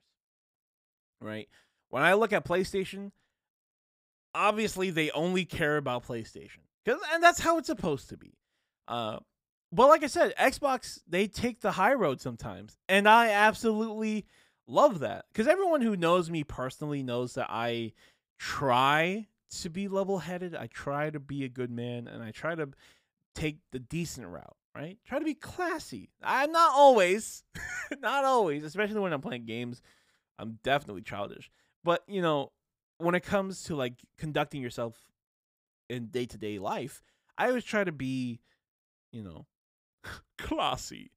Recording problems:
none

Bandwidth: 15.5 kHz